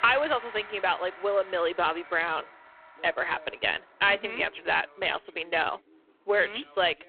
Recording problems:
phone-call audio; poor line
background music; noticeable; throughout; 20 dB below the speech
voice in the background; faint; throughout; 30 dB below the speech

